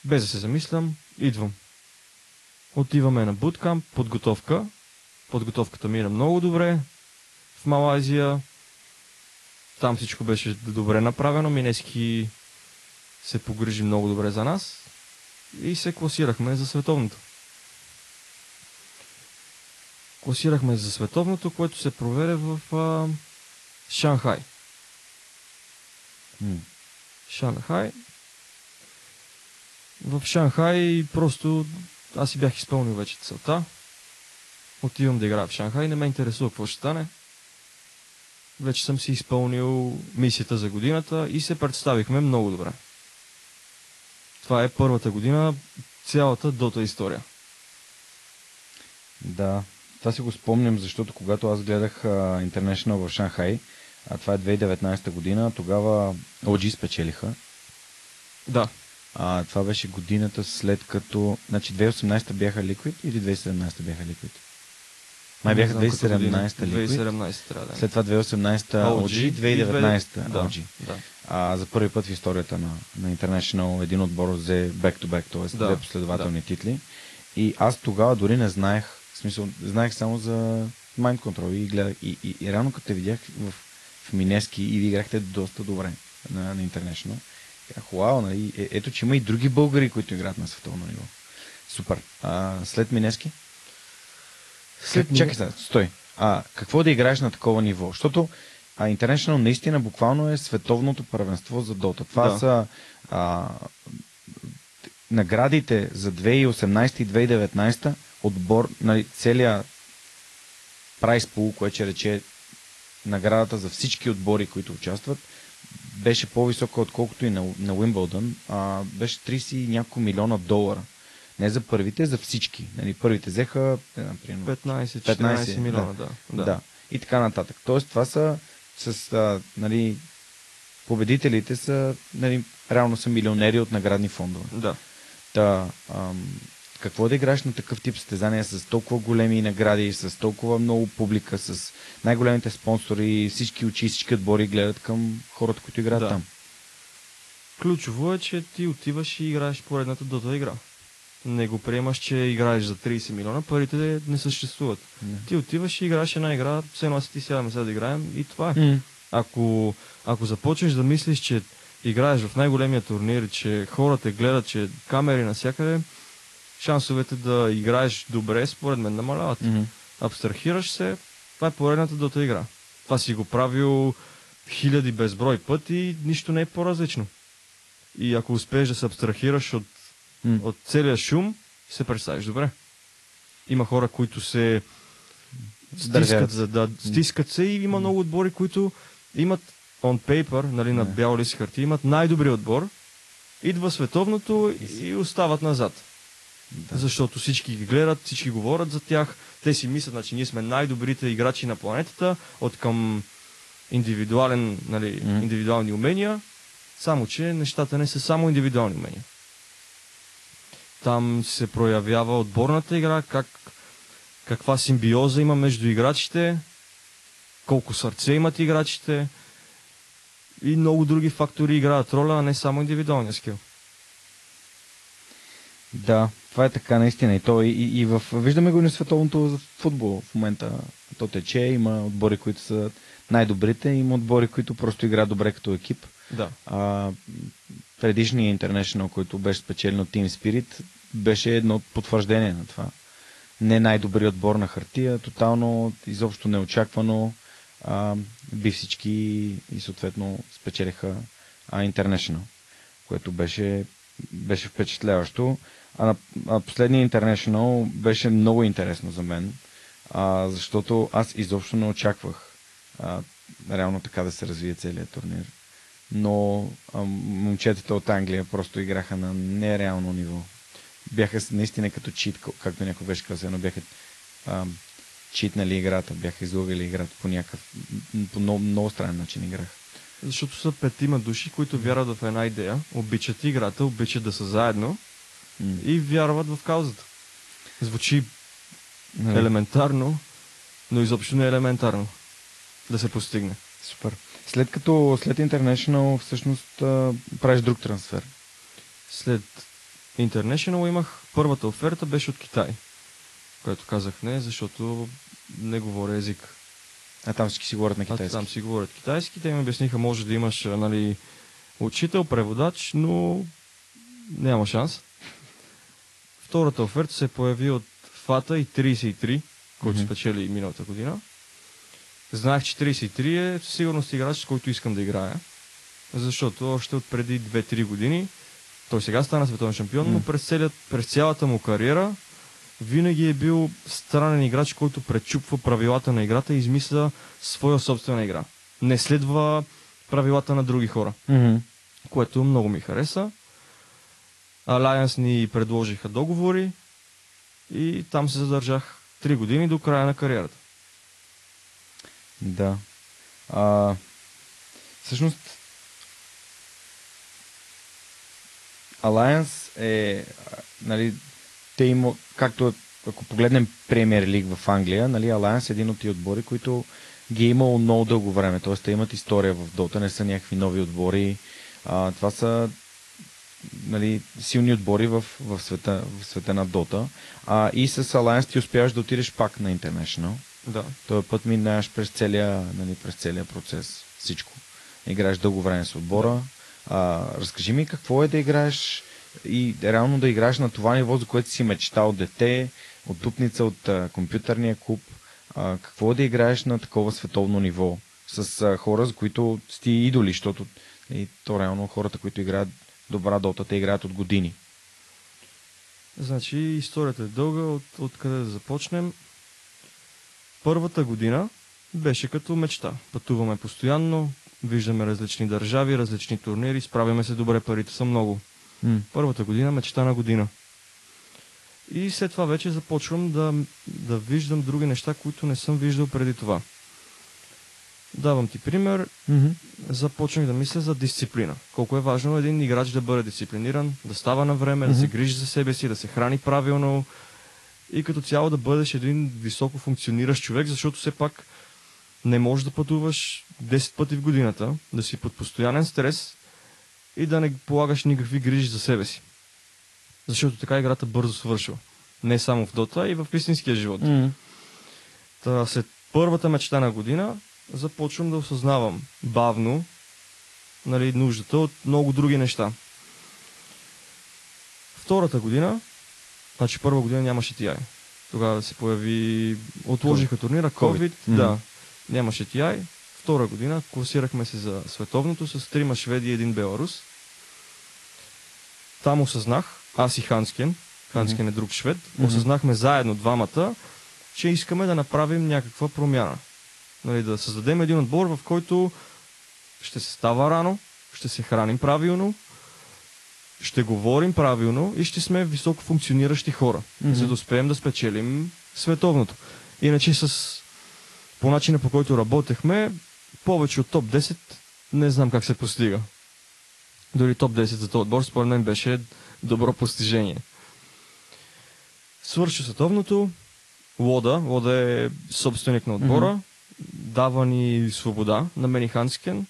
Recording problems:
garbled, watery; slightly; nothing above 11 kHz
hiss; faint; throughout; 25 dB below the speech

